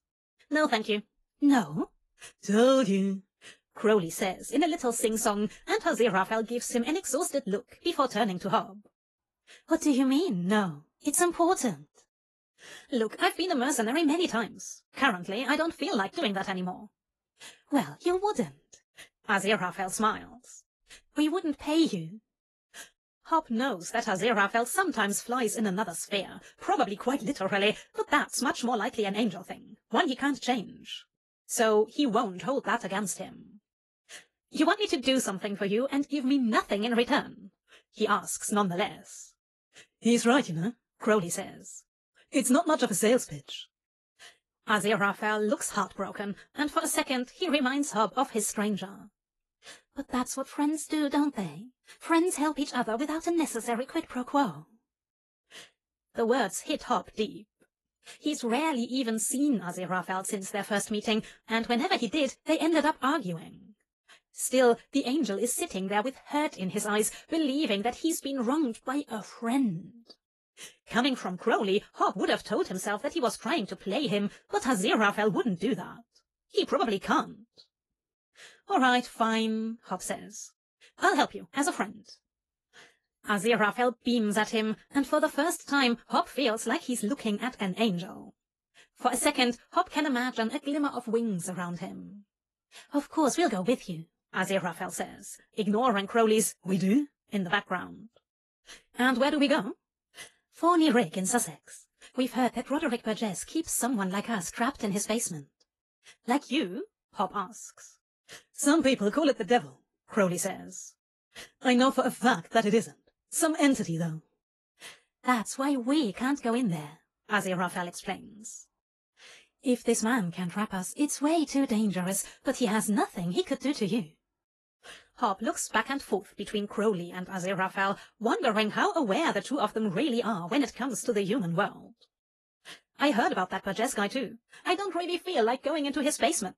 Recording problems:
wrong speed, natural pitch; too fast; 1.5 times normal speed
garbled, watery; slightly; nothing above 11.5 kHz

